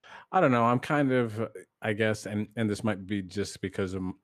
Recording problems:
none

